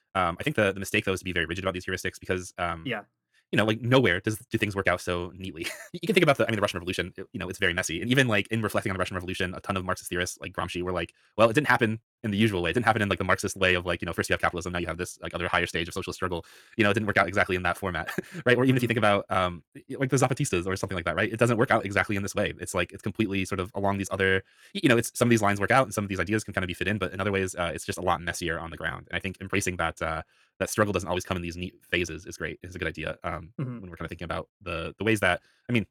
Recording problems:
wrong speed, natural pitch; too fast; 1.6 times normal speed

